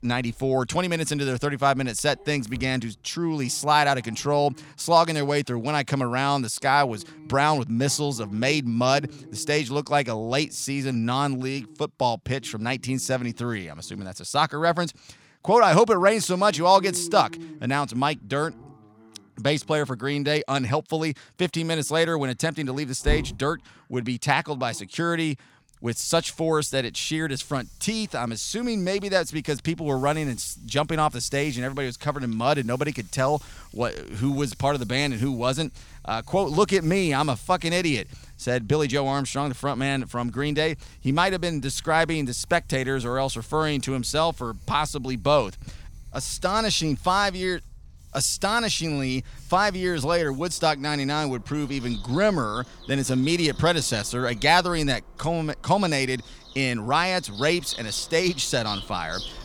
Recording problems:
animal sounds; noticeable; throughout; 20 dB below the speech

